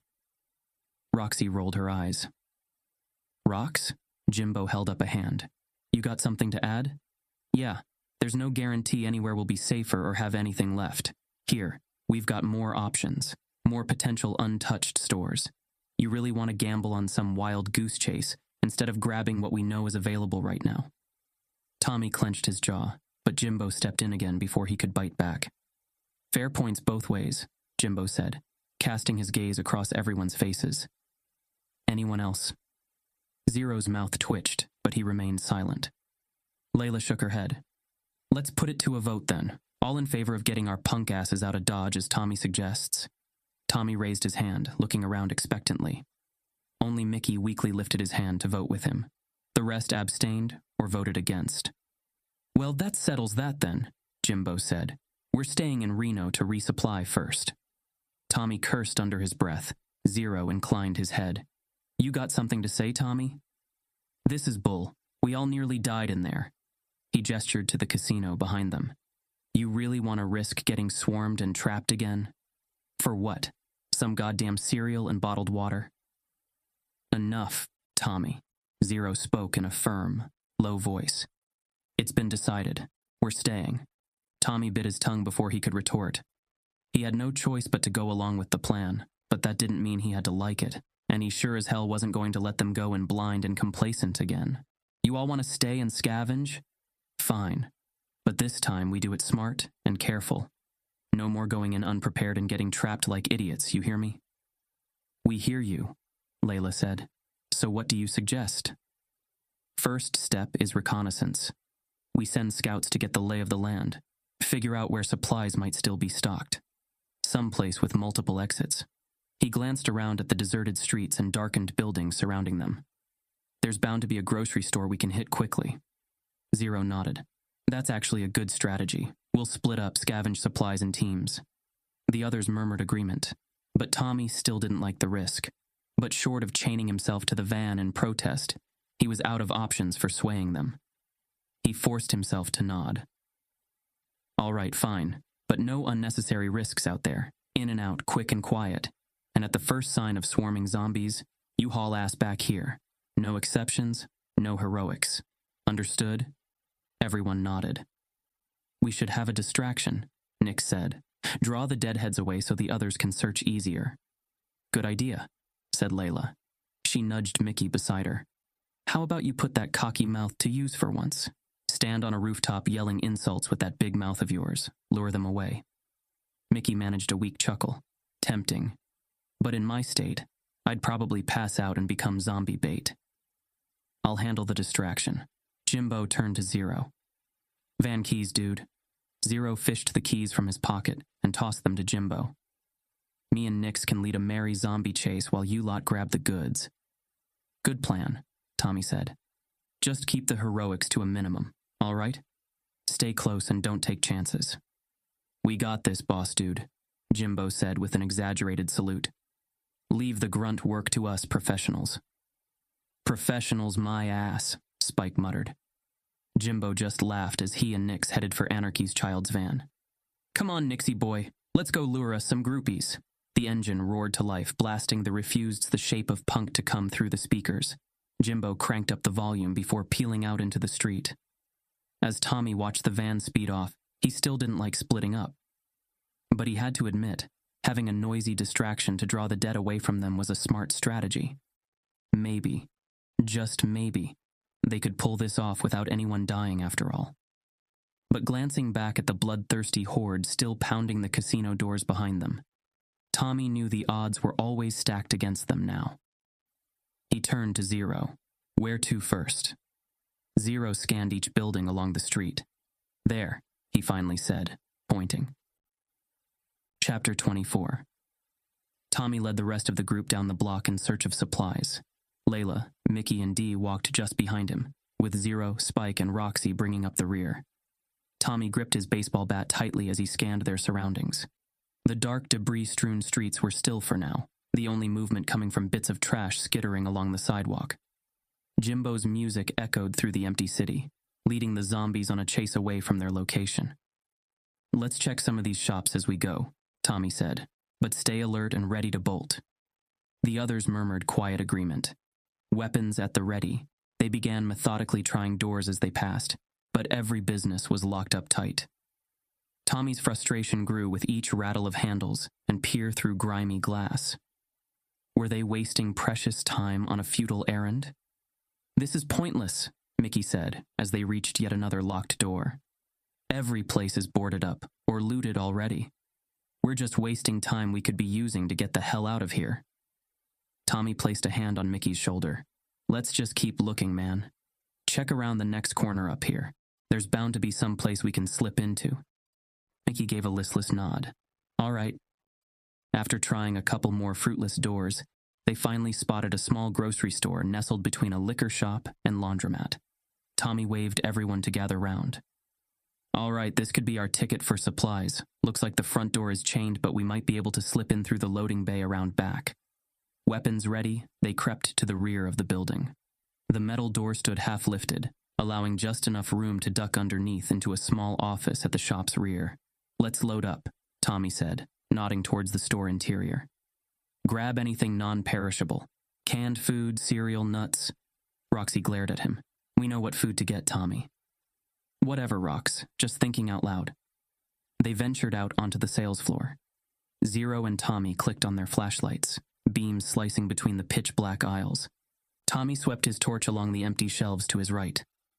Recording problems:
squashed, flat; somewhat

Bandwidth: 14.5 kHz